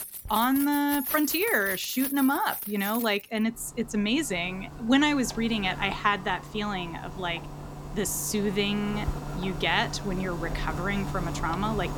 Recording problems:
household noises; loud; throughout; 8 dB below the speech

